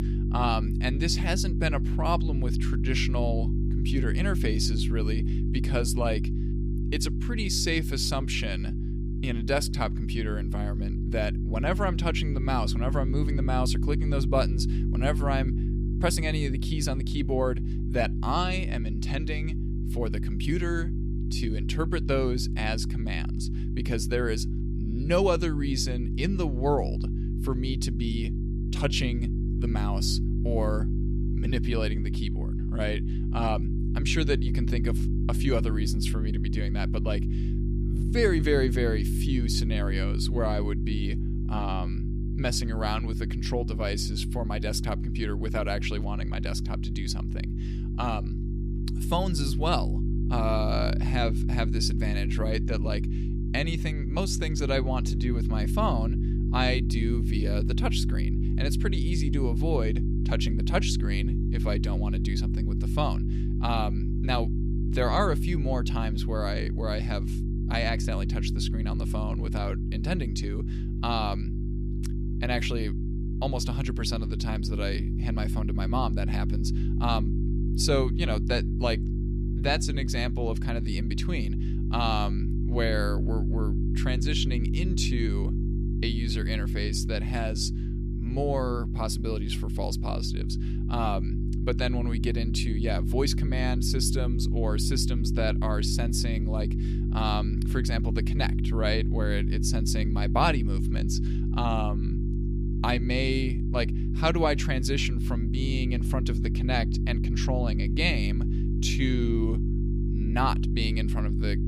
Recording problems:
electrical hum; loud; throughout; 50 Hz, 8 dB below the speech

